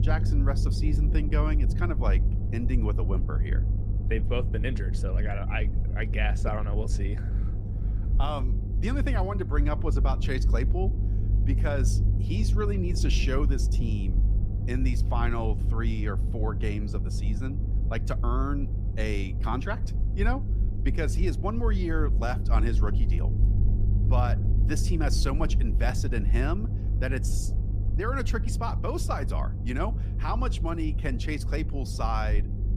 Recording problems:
low rumble; loud; throughout; 9 dB below the speech

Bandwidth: 15 kHz